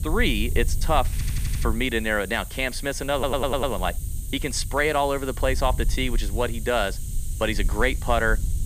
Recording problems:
hiss; noticeable; throughout; 15 dB below the speech
low rumble; faint; throughout; 25 dB below the speech
audio stuttering; at 1 s and at 3 s

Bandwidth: 15 kHz